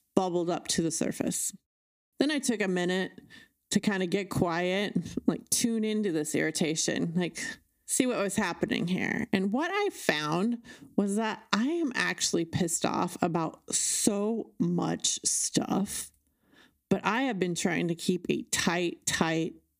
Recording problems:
squashed, flat; somewhat

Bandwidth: 15 kHz